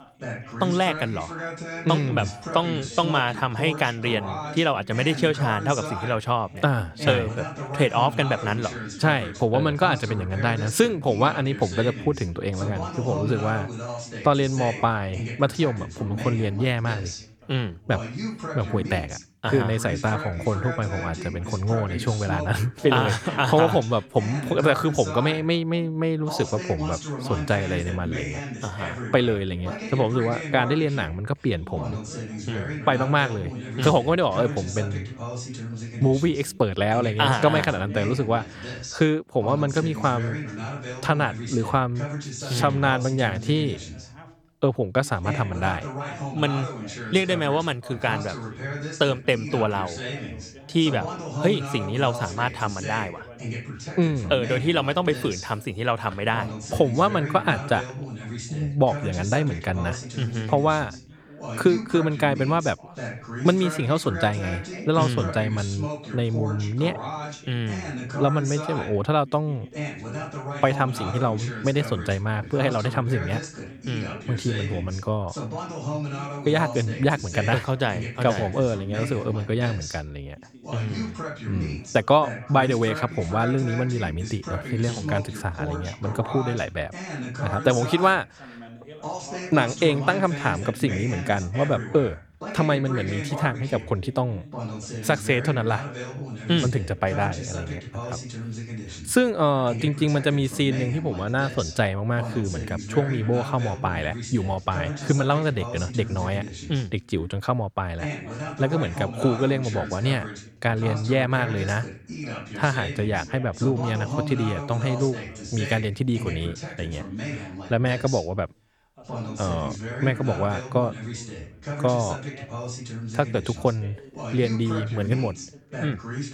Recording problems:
background chatter; loud; throughout; 2 voices, 9 dB below the speech

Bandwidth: 18.5 kHz